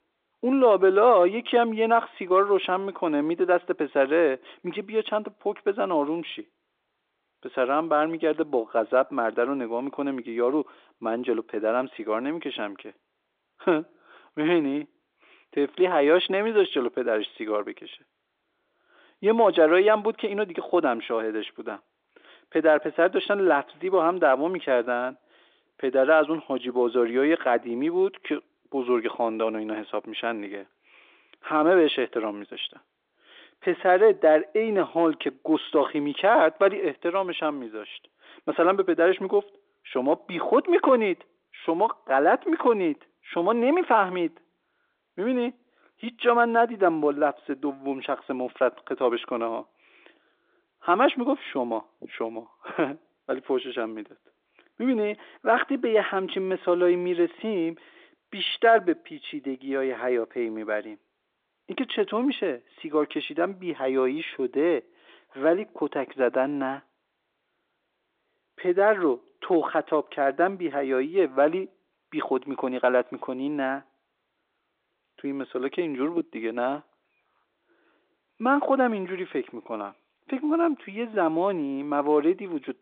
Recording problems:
phone-call audio; nothing above 3.5 kHz

